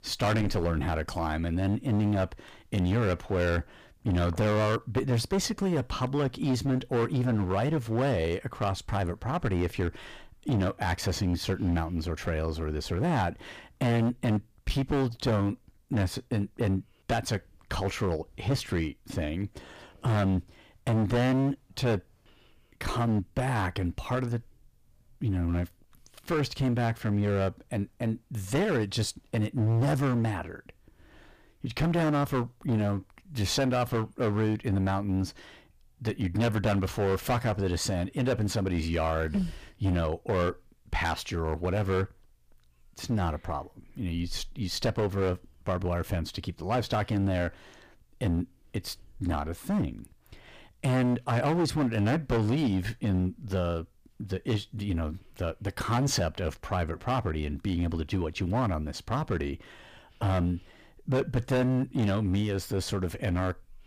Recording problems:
distortion; heavy; 11% of the sound clipped

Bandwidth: 15 kHz